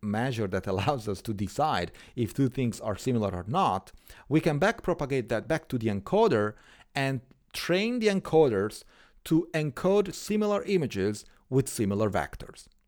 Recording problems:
none

